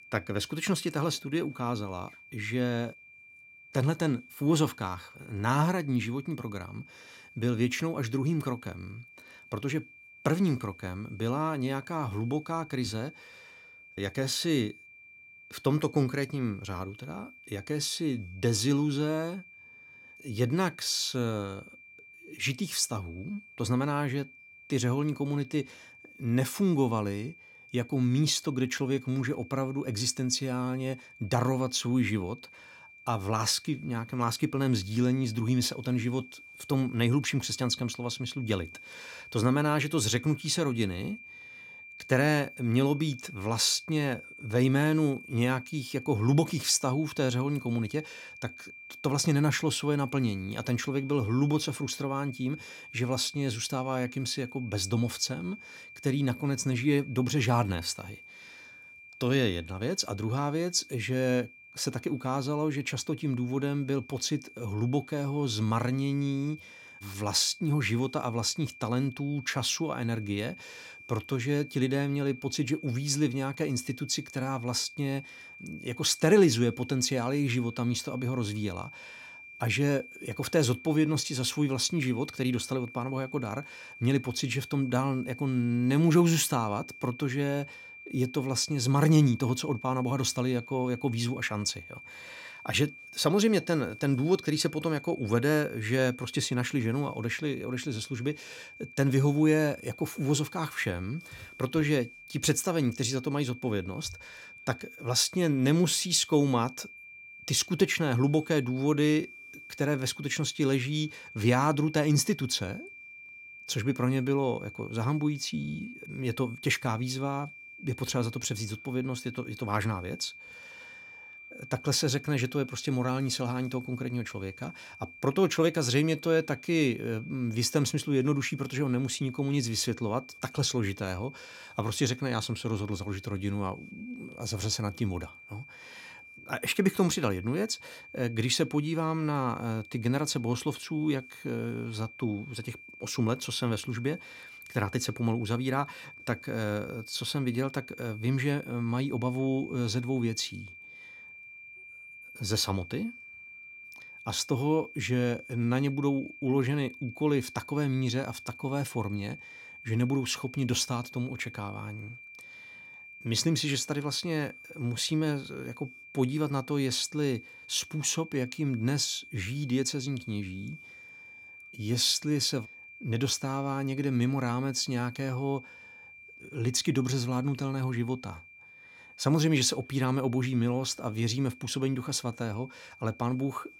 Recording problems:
high-pitched whine; noticeable; throughout; 2.5 kHz, 15 dB below the speech

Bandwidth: 16.5 kHz